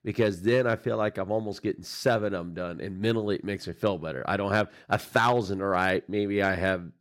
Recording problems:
none

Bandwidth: 16.5 kHz